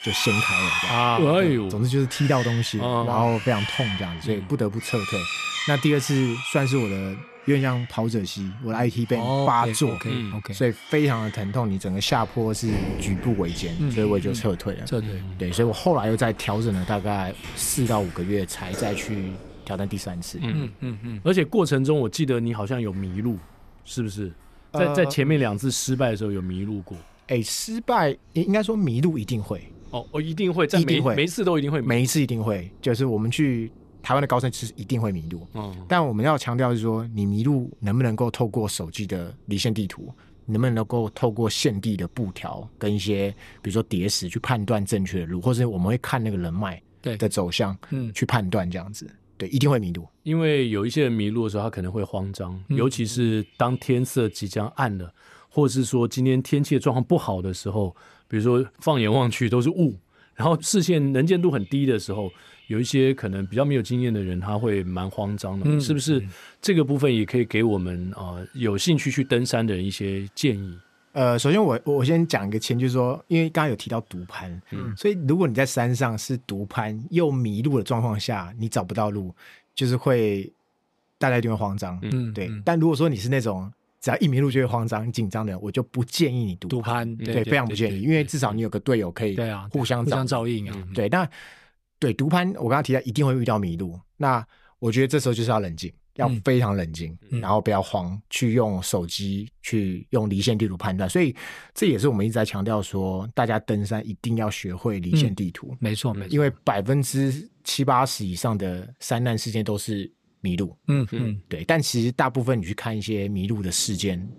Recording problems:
animal sounds; loud; throughout; 8 dB below the speech

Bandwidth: 14 kHz